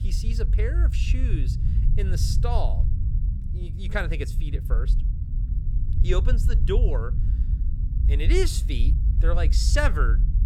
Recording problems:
low rumble; noticeable; throughout; 10 dB below the speech

